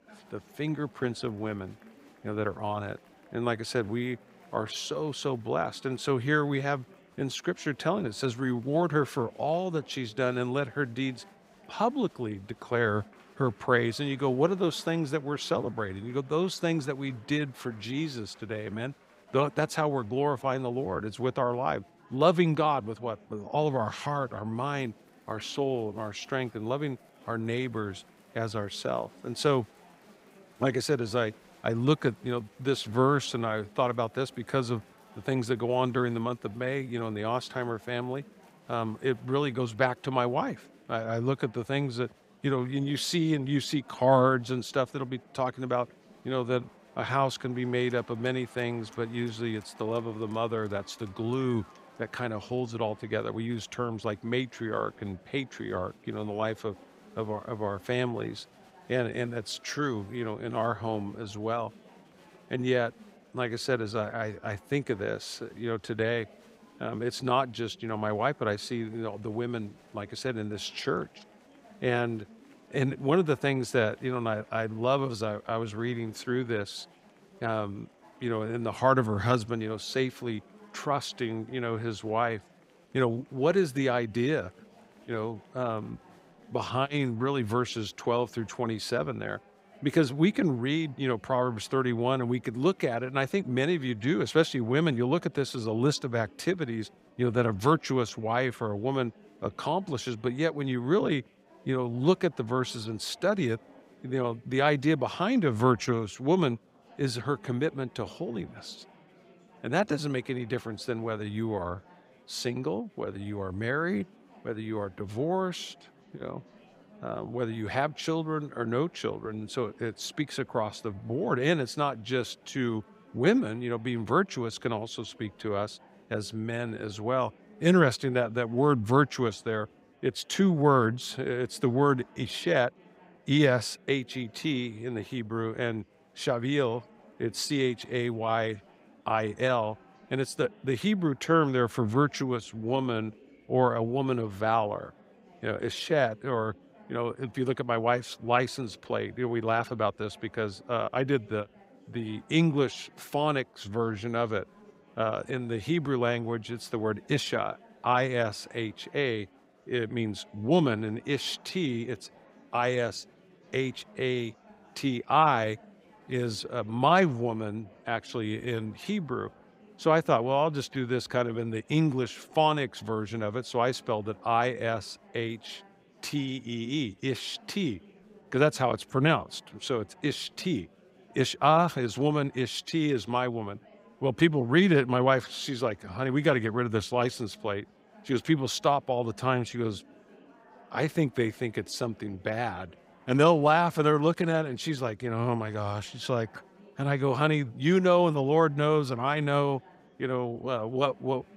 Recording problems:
murmuring crowd; faint; throughout; 25 dB below the speech

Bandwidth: 15.5 kHz